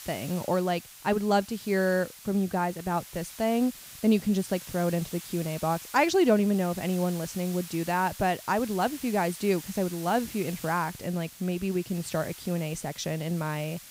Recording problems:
hiss; noticeable; throughout; 15 dB below the speech

